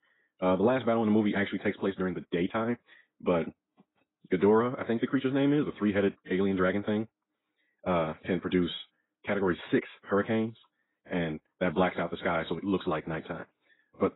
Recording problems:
garbled, watery; badly; nothing above 4 kHz
wrong speed, natural pitch; too fast; 1.5 times normal speed

